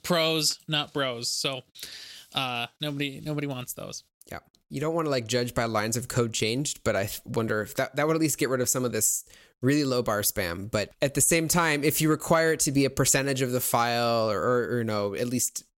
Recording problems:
none

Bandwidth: 16 kHz